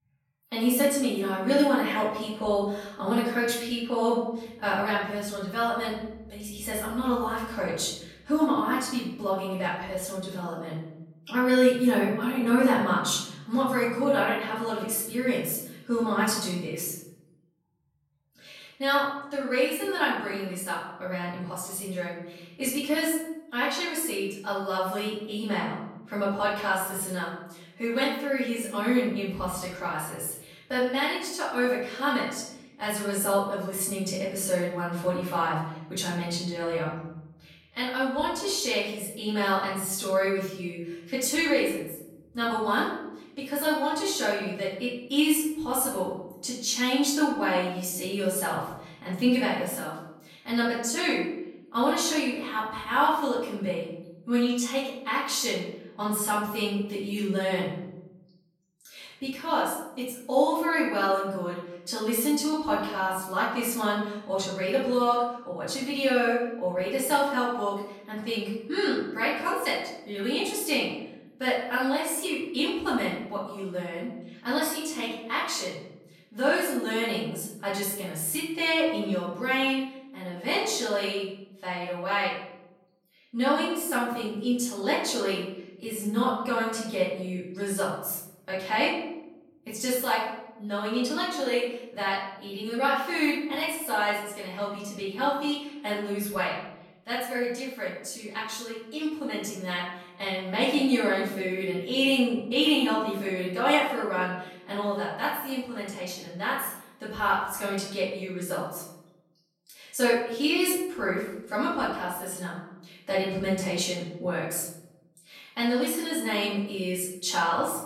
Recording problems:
off-mic speech; far
room echo; noticeable; dies away in 0.8 s

